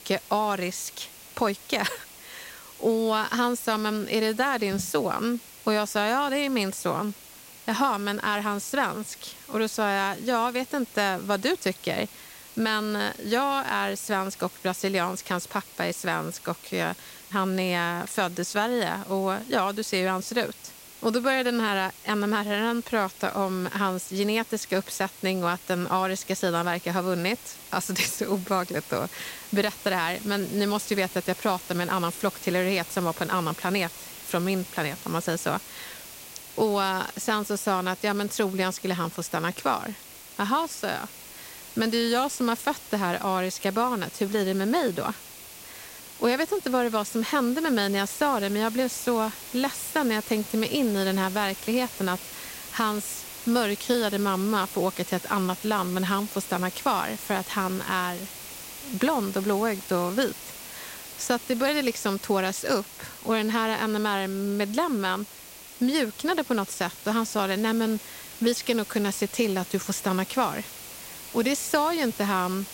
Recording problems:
hiss; noticeable; throughout; 15 dB below the speech

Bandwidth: 16 kHz